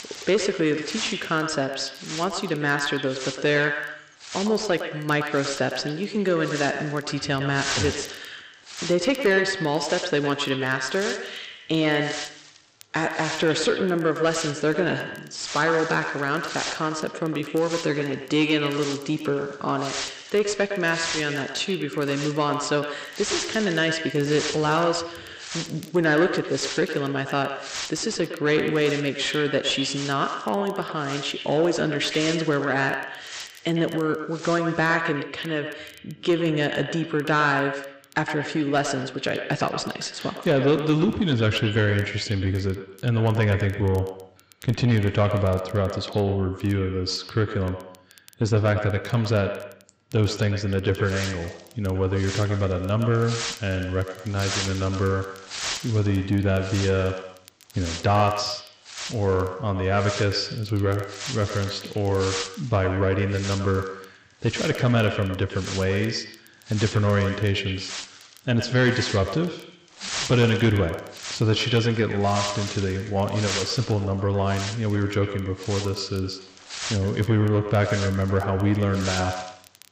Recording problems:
echo of what is said; strong; throughout; 110 ms later, 9 dB below the speech
high frequencies cut off; noticeable; nothing above 8 kHz
distortion; slight; 10 dB below the speech
wind noise on the microphone; heavy; until 35 s and from 51 s on; 7 dB below the speech
crackle, like an old record; faint; 30 dB below the speech

